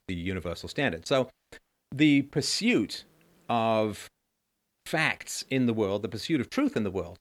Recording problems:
none

